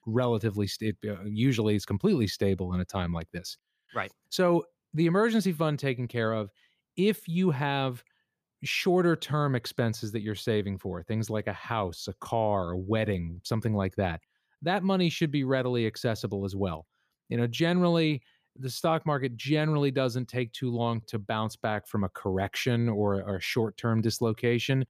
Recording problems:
none

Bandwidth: 15 kHz